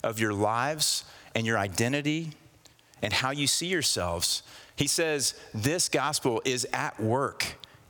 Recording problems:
squashed, flat; heavily

